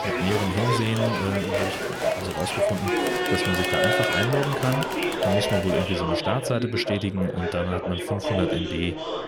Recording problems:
chatter from many people; very loud; throughout; 2 dB above the speech

